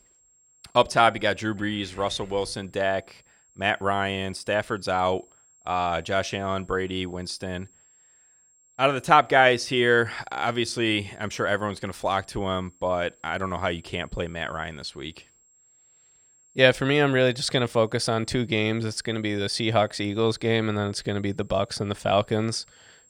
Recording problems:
high-pitched whine; faint; throughout; 7.5 kHz, 30 dB below the speech

